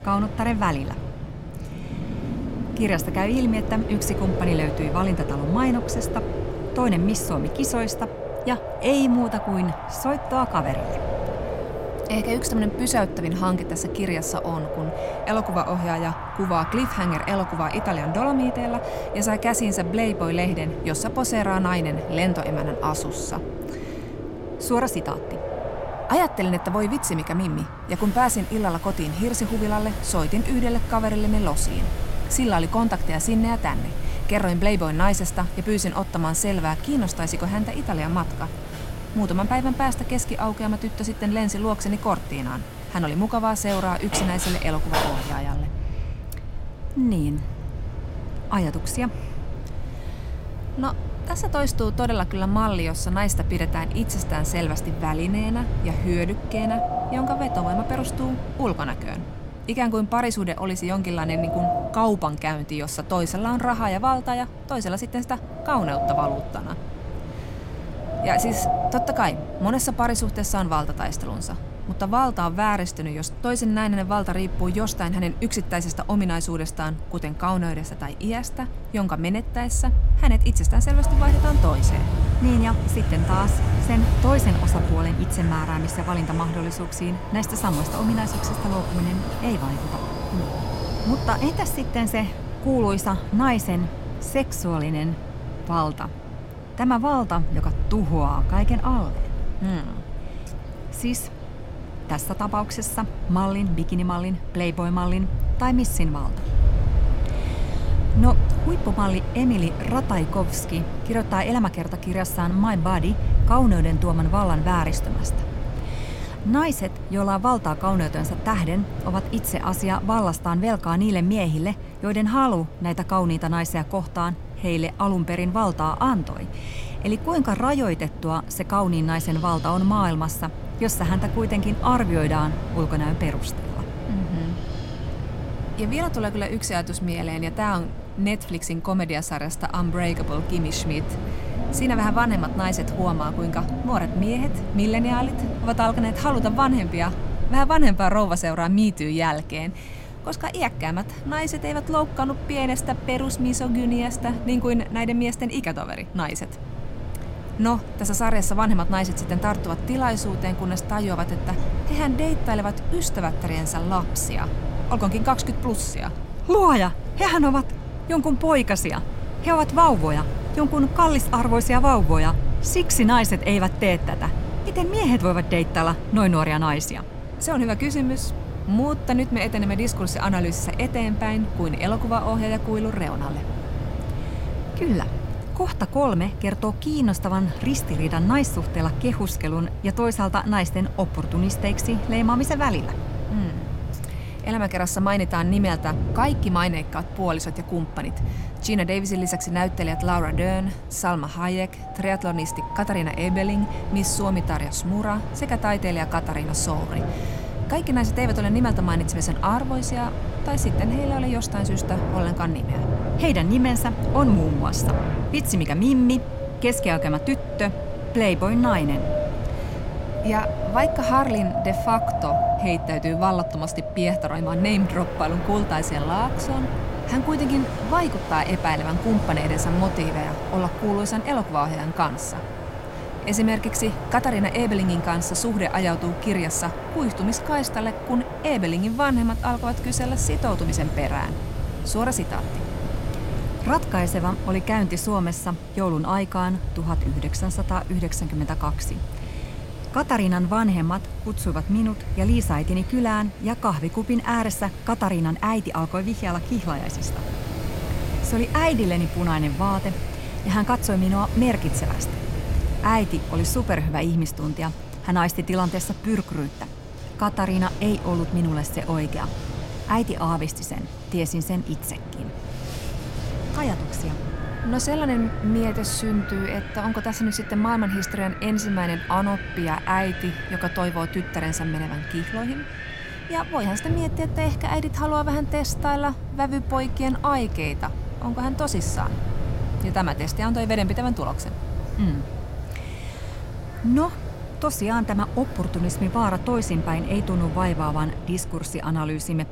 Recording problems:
wind in the background; loud; throughout; 5 dB below the speech

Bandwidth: 16 kHz